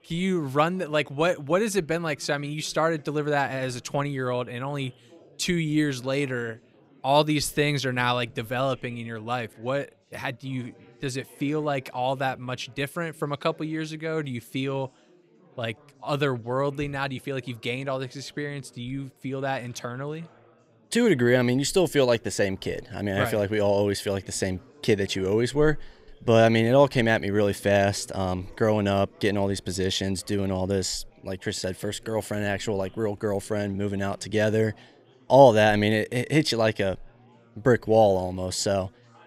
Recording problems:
chatter from many people; faint; throughout; 30 dB below the speech

